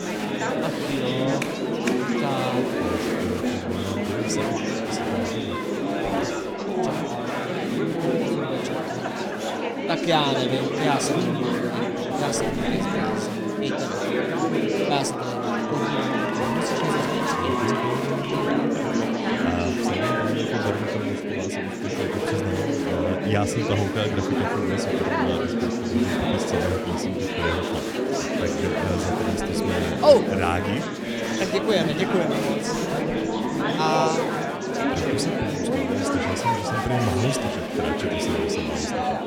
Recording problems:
murmuring crowd; very loud; throughout; 4 dB above the speech

